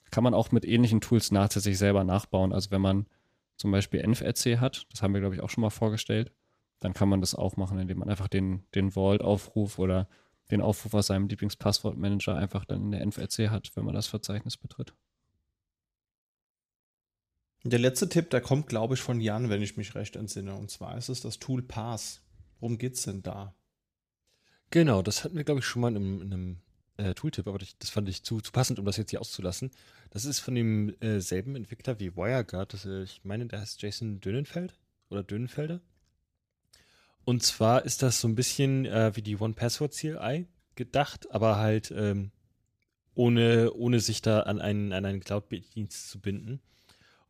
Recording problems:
uneven, jittery; strongly; from 9 to 46 s

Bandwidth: 14.5 kHz